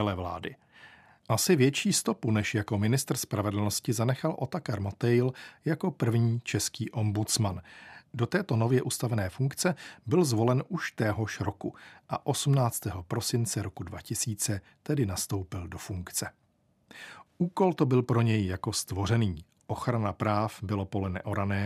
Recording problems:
abrupt cut into speech; at the start and the end

